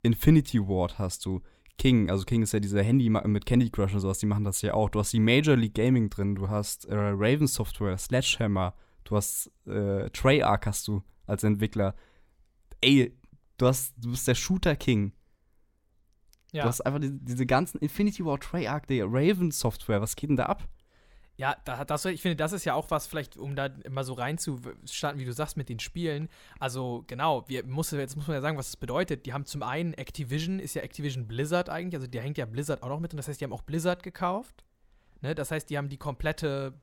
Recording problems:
none

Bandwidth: 17.5 kHz